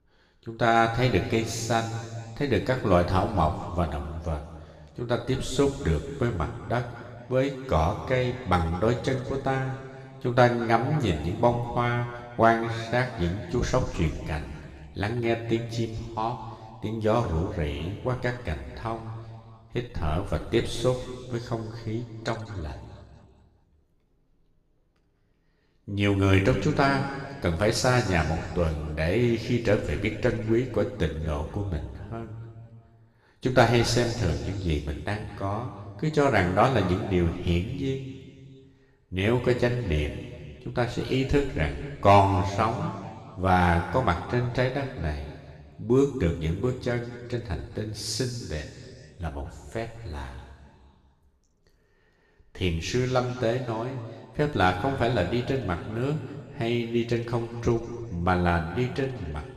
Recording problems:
room echo; noticeable; dies away in 2 s
off-mic speech; somewhat distant

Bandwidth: 14.5 kHz